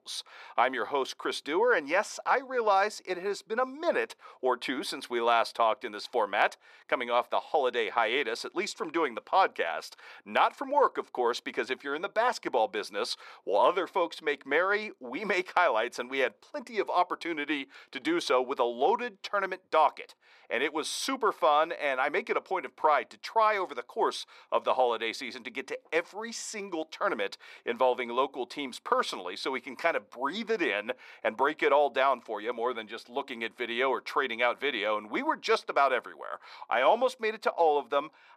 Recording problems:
thin; somewhat; fading below 450 Hz

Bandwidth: 14 kHz